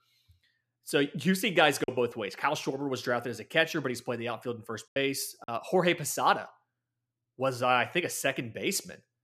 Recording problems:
choppy; occasionally; at 2 s and at 5 s; 3% of the speech affected

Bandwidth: 14.5 kHz